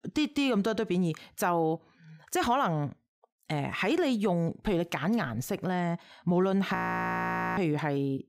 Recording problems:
audio freezing; at 7 s for 1 s

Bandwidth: 15.5 kHz